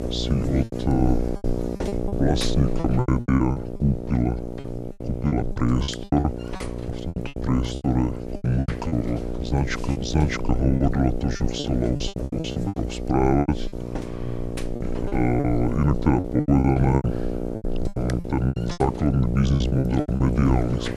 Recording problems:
wrong speed and pitch; too slow and too low; 0.7 times normal speed
electrical hum; loud; throughout; 60 Hz, 6 dB below the speech
choppy; very; 15% of the speech affected

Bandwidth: 13.5 kHz